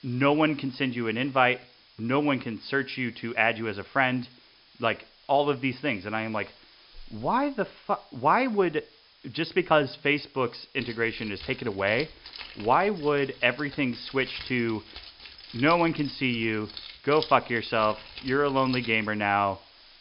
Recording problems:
high frequencies cut off; noticeable; nothing above 5.5 kHz
hiss; faint; throughout; 25 dB below the speech
jangling keys; noticeable; from 11 to 19 s; peak 10 dB below the speech

